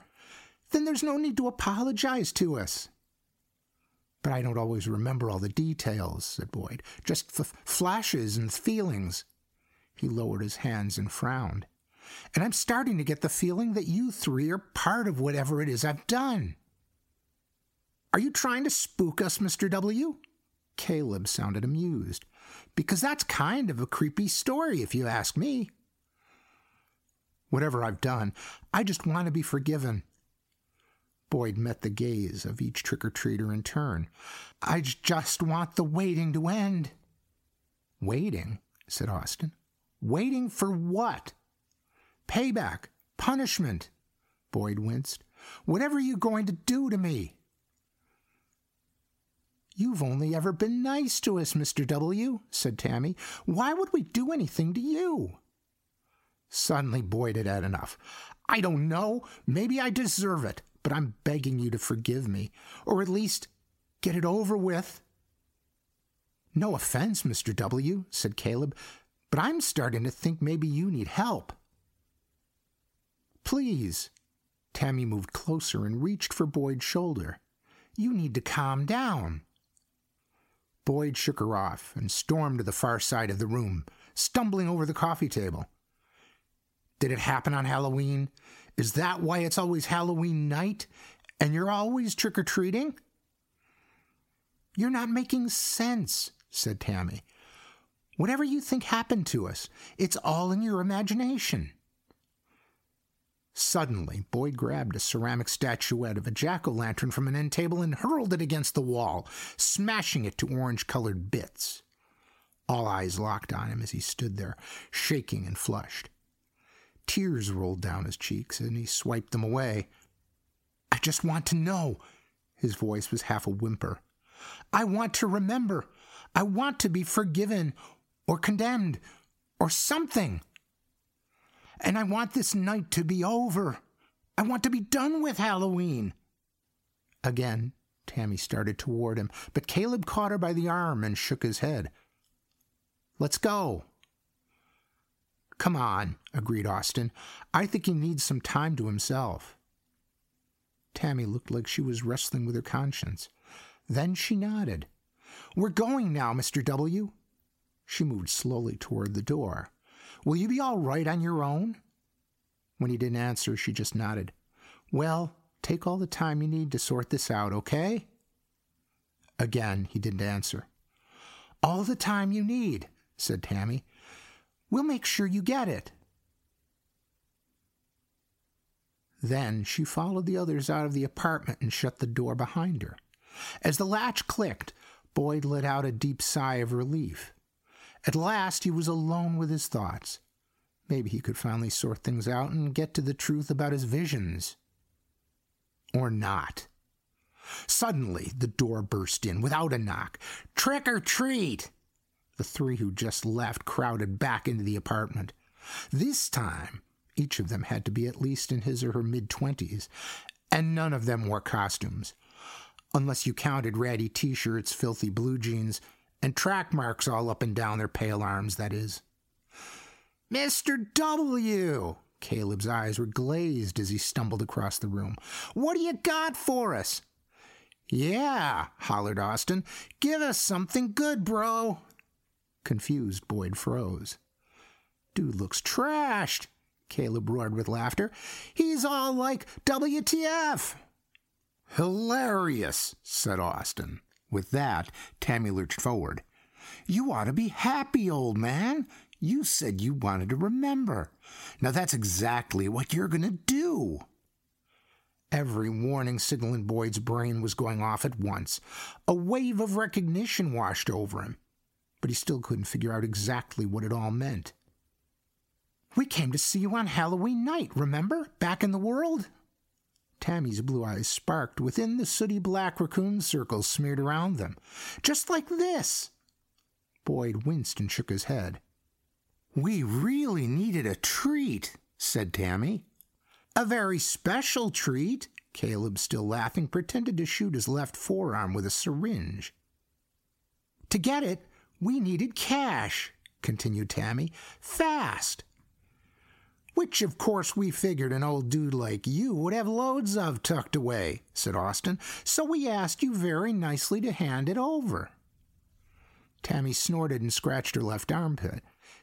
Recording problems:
squashed, flat; heavily

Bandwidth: 16 kHz